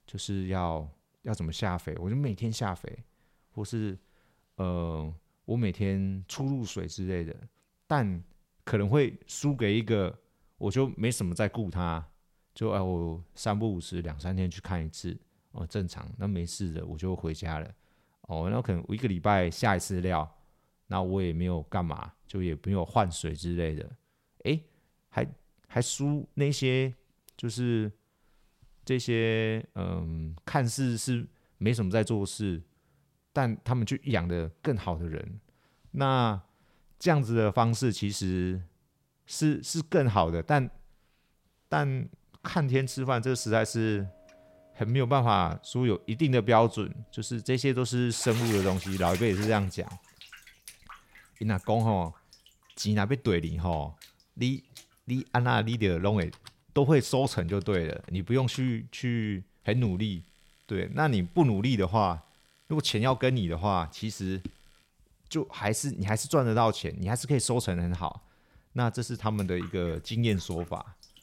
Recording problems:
household noises; noticeable; from 43 s on; 15 dB below the speech

